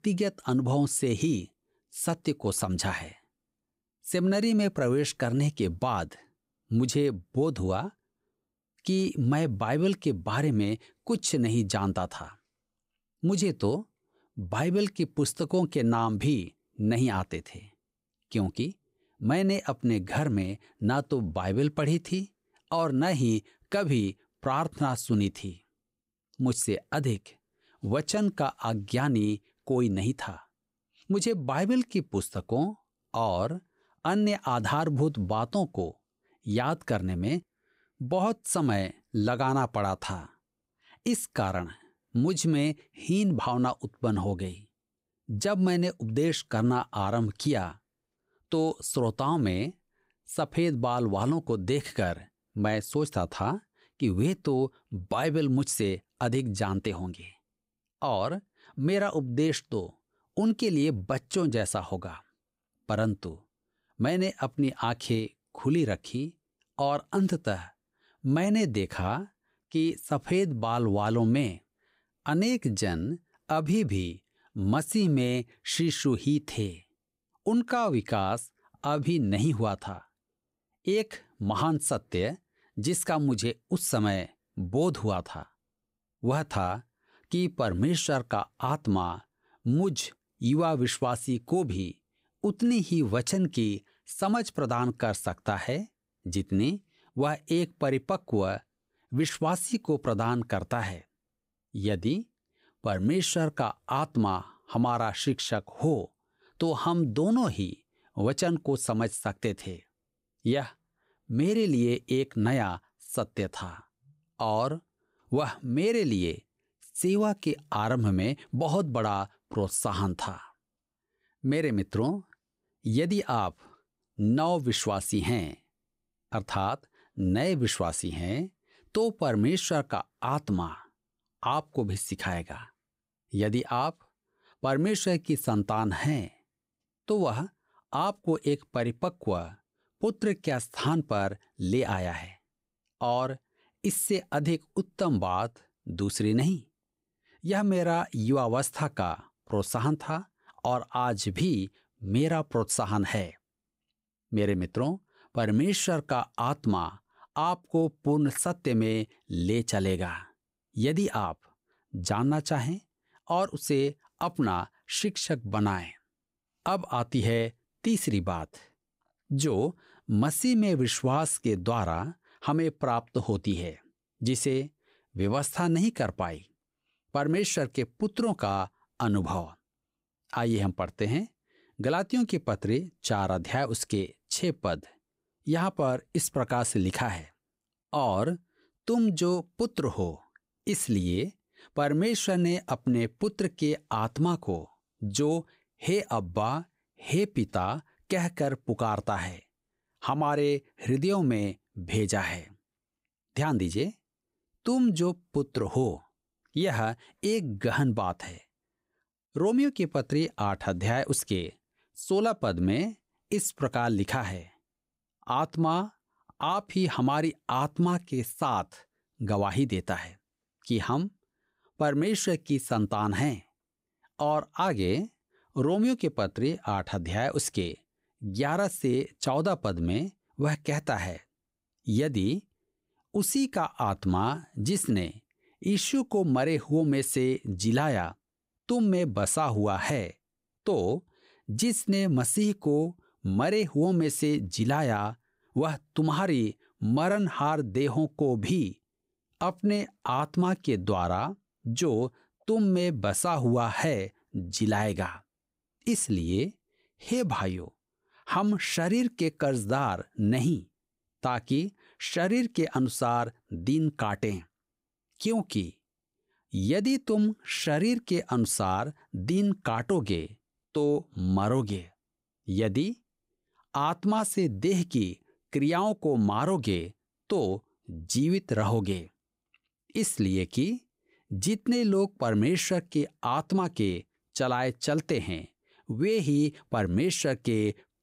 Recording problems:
uneven, jittery; slightly; from 19 s to 4:28

